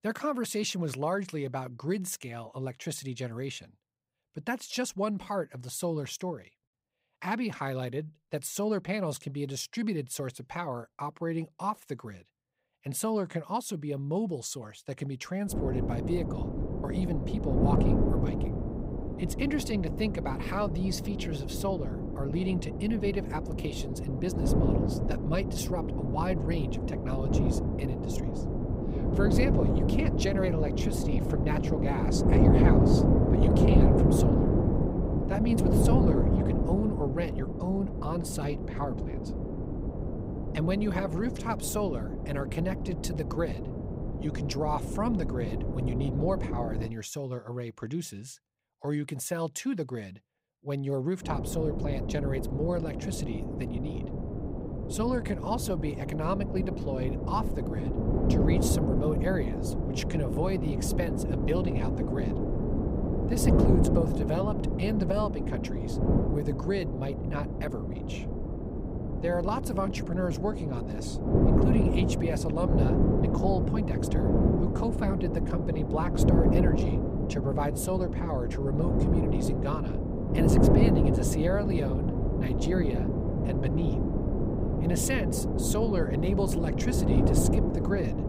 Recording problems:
wind noise on the microphone; heavy; from 16 to 47 s and from 51 s on; as loud as the speech

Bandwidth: 15.5 kHz